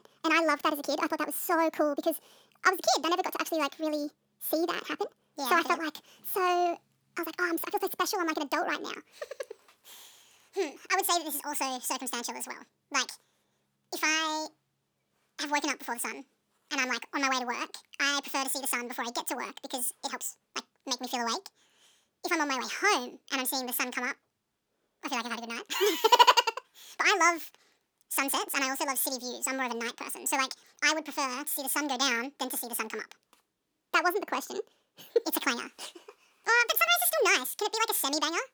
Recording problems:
wrong speed and pitch; too fast and too high; 1.7 times normal speed

